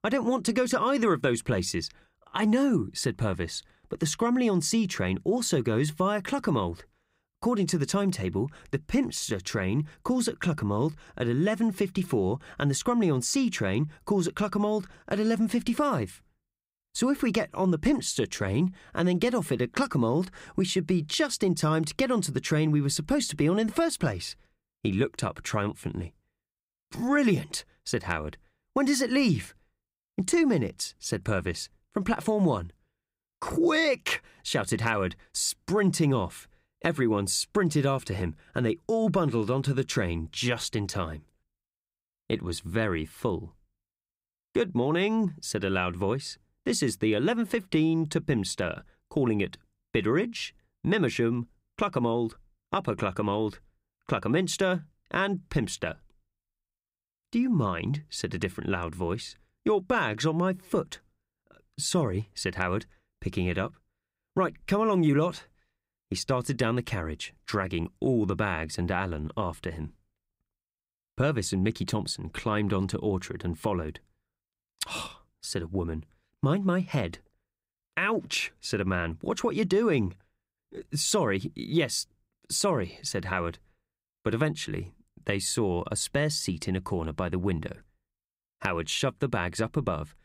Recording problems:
none

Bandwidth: 15.5 kHz